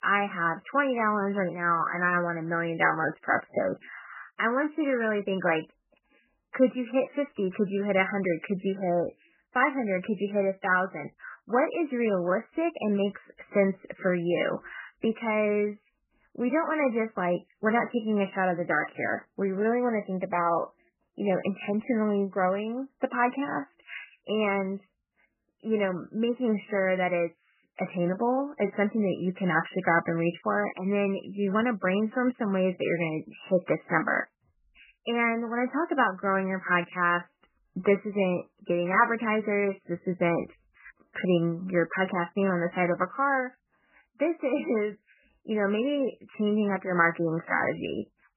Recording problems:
garbled, watery; badly; nothing above 3 kHz
high-pitched whine; very faint; throughout; 1.5 kHz, 80 dB below the speech

